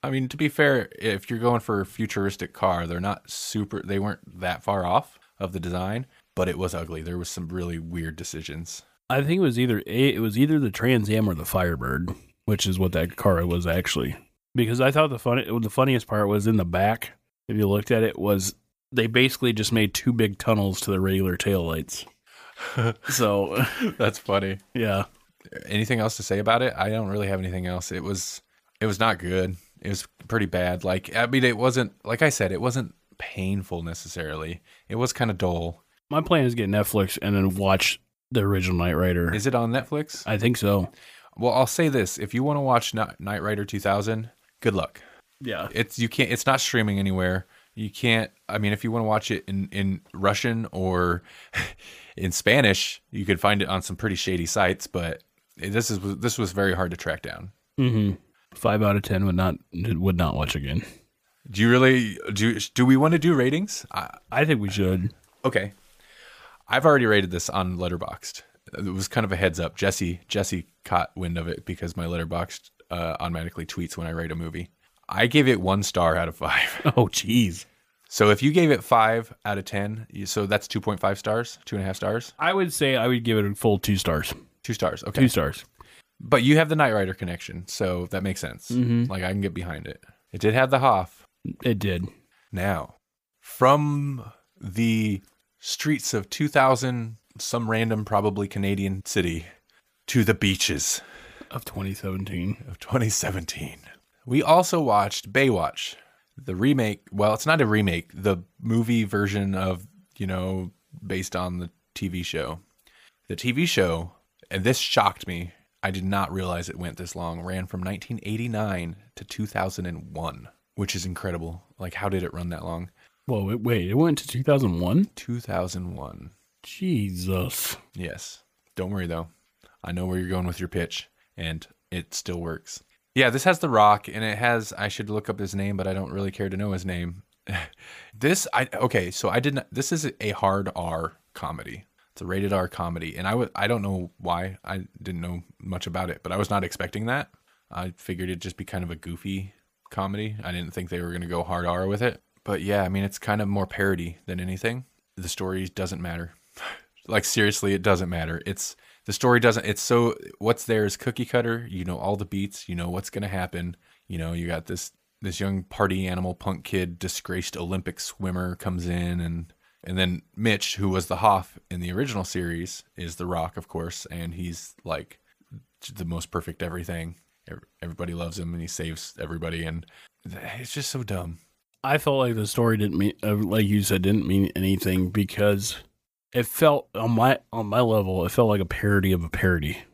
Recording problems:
none

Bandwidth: 15 kHz